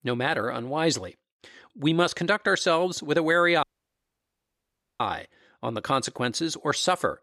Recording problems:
audio cutting out; at 3.5 s for 1.5 s

